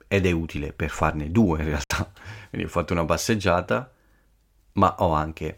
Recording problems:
choppy; occasionally; 1% of the speech affected

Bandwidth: 16.5 kHz